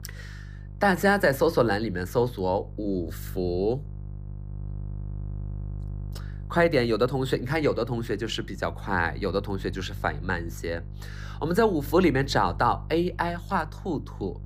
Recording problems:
electrical hum; faint; throughout; 50 Hz, 25 dB below the speech

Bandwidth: 15 kHz